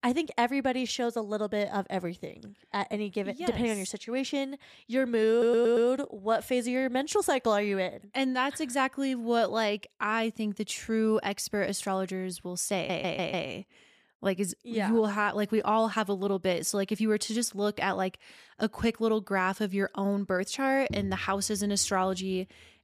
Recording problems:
audio stuttering; at 5.5 s and at 13 s

